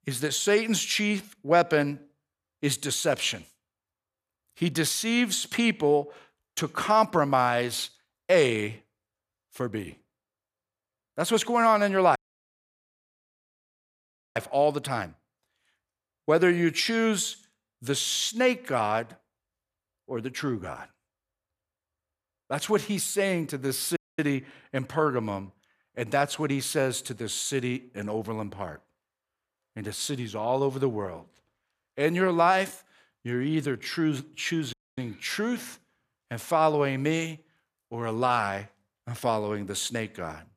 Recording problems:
audio cutting out; at 12 s for 2 s, at 24 s and at 35 s

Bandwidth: 14.5 kHz